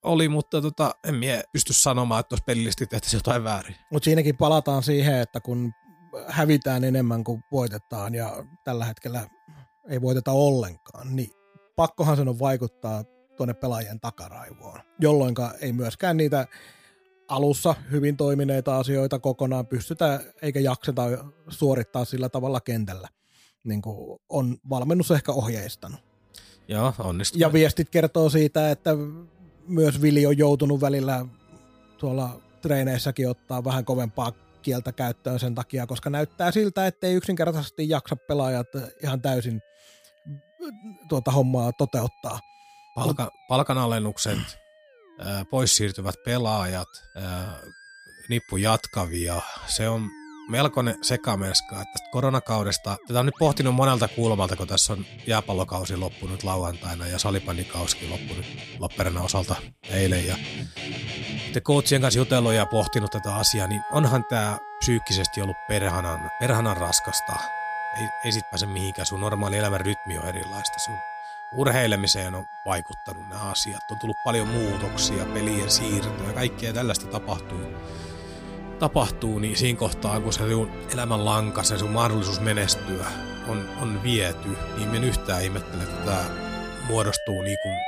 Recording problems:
background music; noticeable; throughout; 10 dB below the speech

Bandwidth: 15 kHz